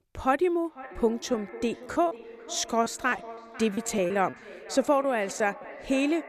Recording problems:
echo of what is said; noticeable; throughout; 500 ms later, 15 dB below the speech
choppy; very; 6% of the speech affected

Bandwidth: 14.5 kHz